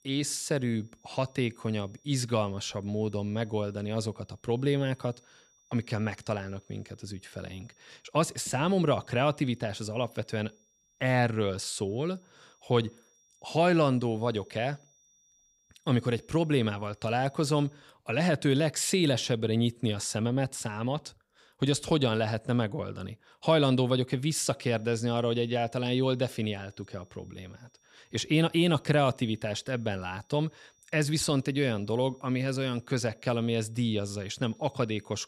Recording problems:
high-pitched whine; faint; until 18 s and from 25 s on; 5.5 kHz, 35 dB below the speech

